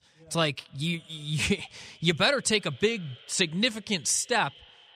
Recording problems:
echo of what is said; faint; throughout; 240 ms later, 25 dB below the speech

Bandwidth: 14.5 kHz